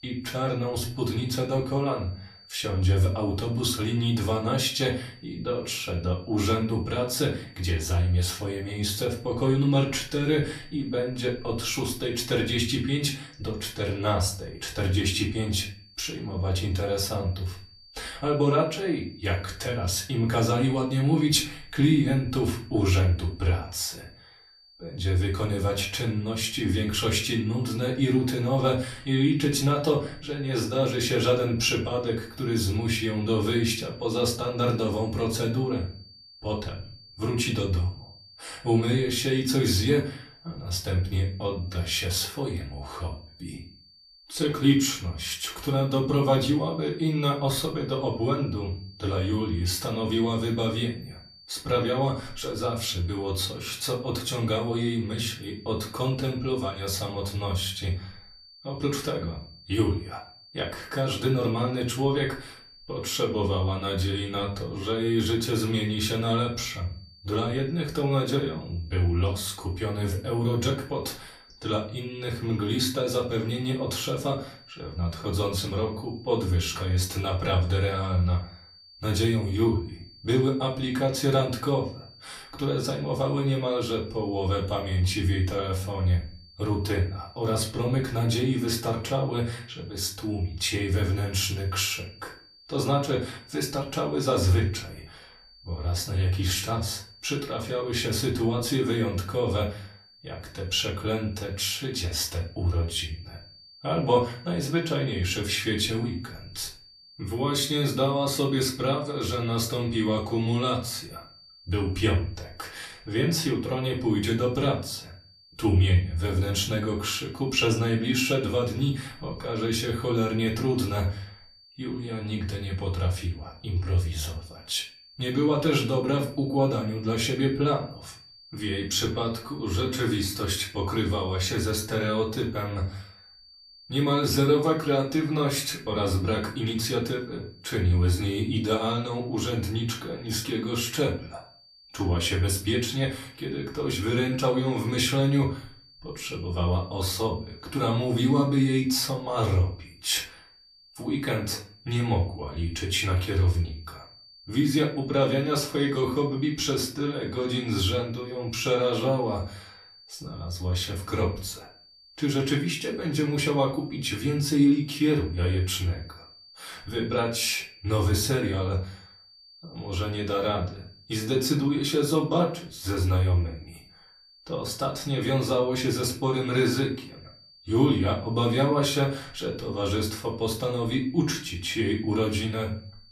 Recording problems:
off-mic speech; far
room echo; slight; dies away in 0.3 s
high-pitched whine; faint; throughout; 4.5 kHz, 25 dB below the speech

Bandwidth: 14 kHz